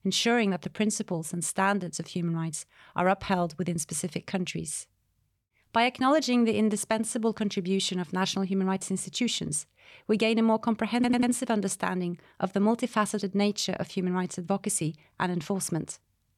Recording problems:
audio stuttering; at 11 s

